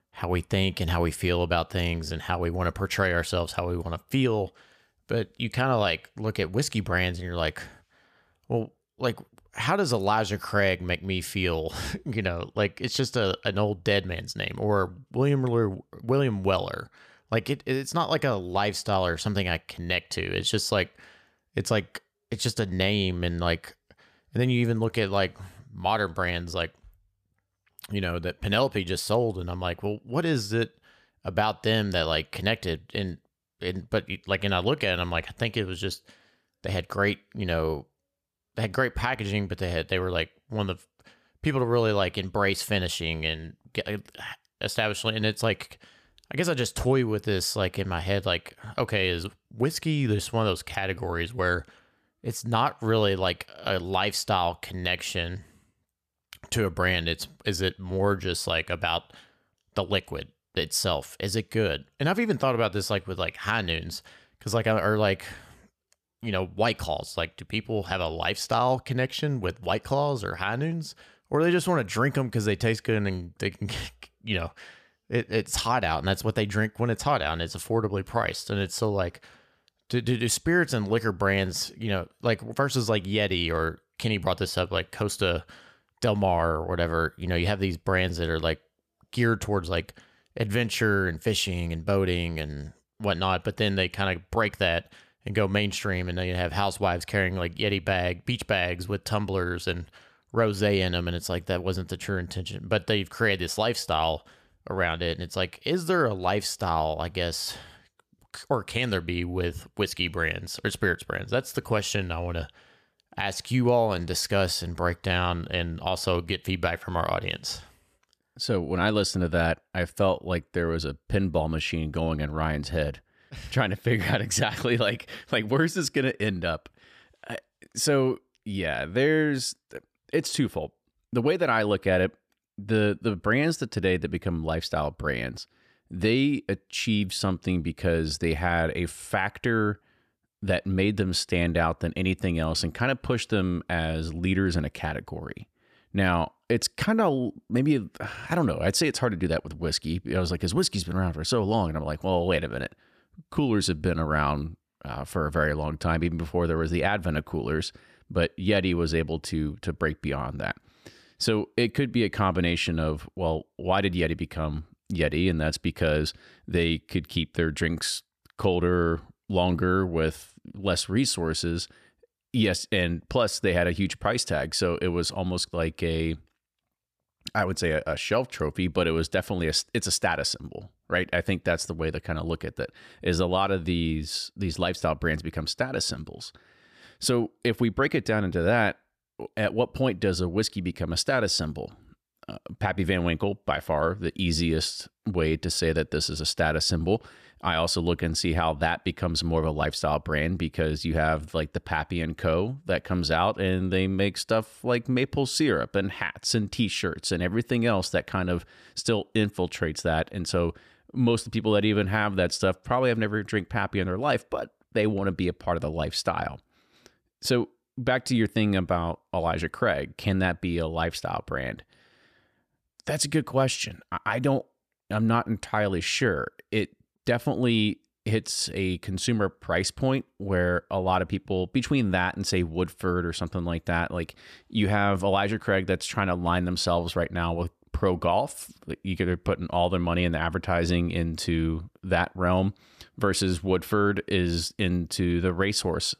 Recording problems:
none

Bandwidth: 14.5 kHz